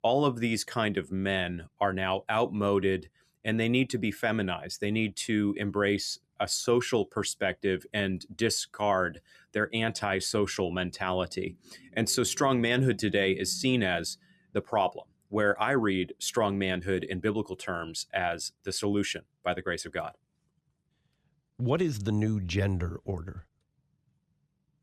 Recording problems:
none

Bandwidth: 14.5 kHz